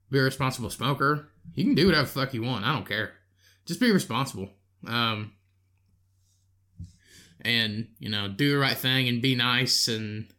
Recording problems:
none

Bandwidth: 17 kHz